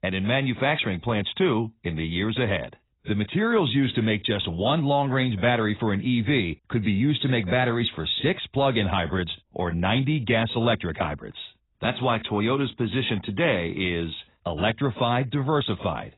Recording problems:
garbled, watery; badly; nothing above 4 kHz

